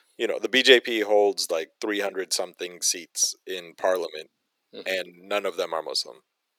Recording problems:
thin; very; fading below 350 Hz

